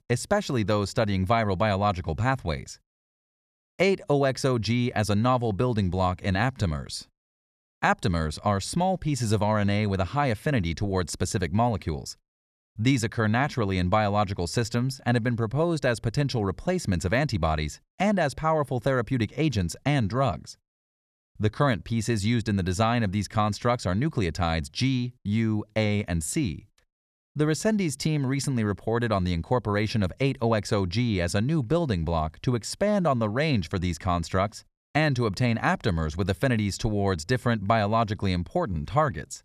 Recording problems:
none

